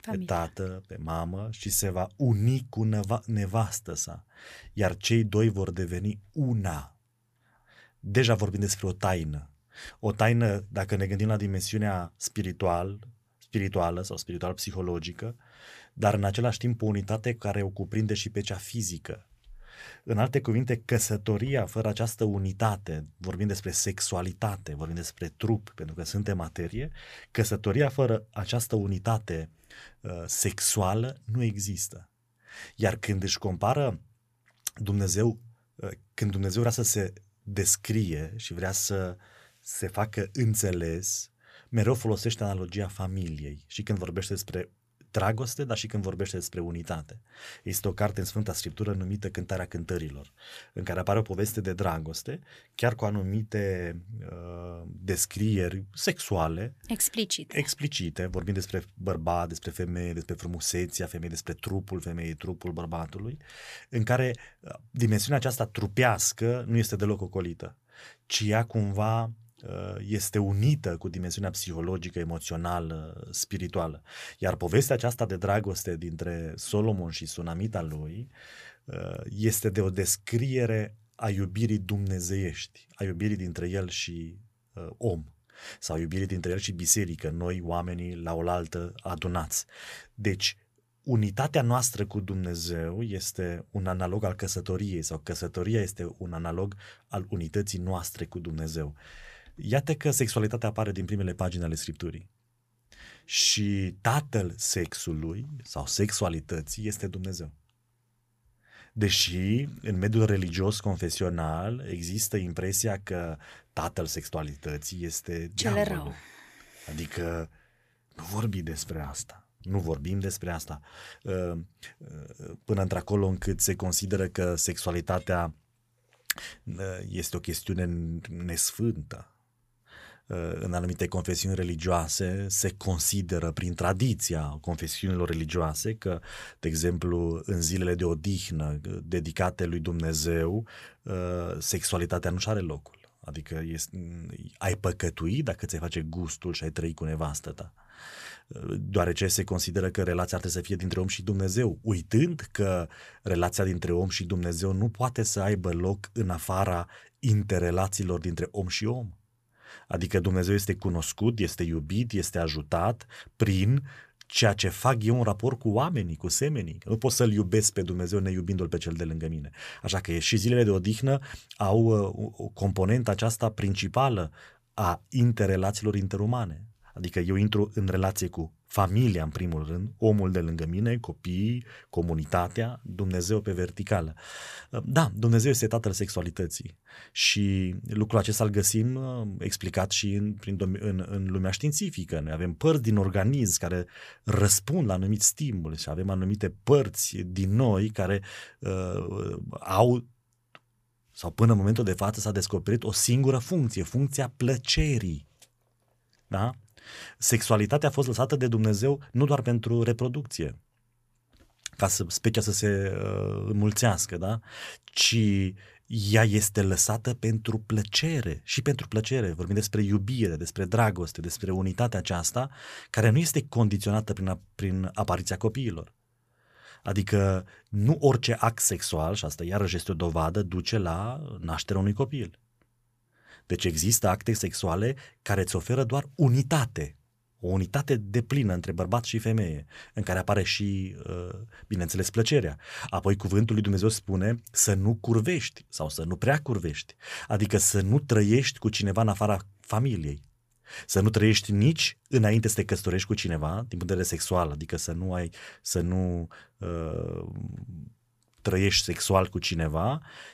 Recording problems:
none

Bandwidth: 14.5 kHz